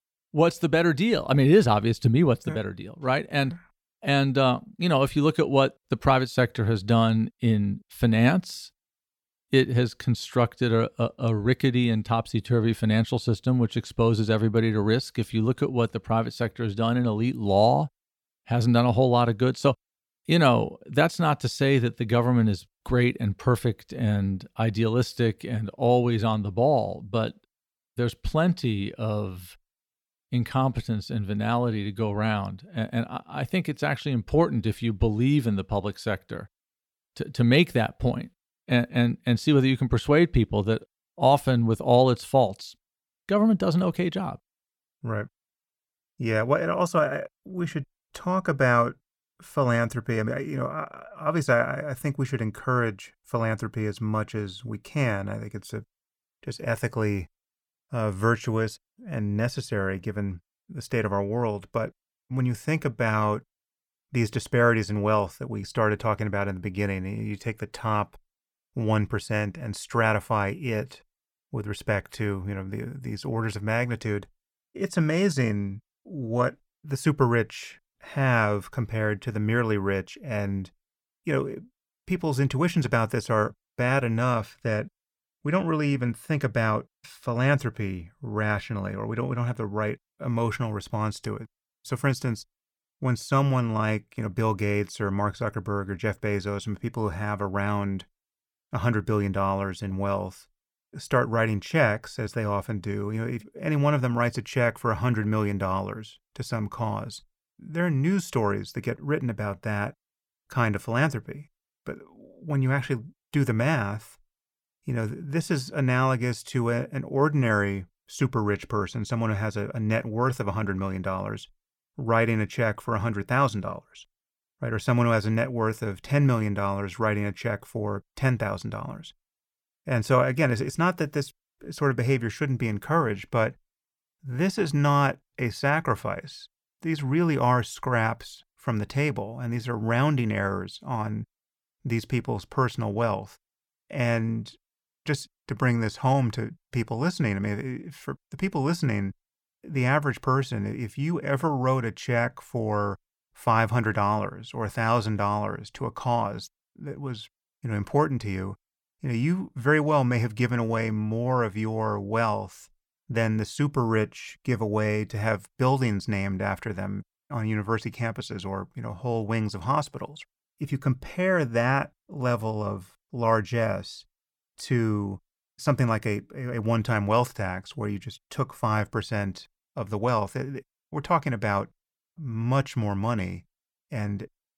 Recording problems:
none

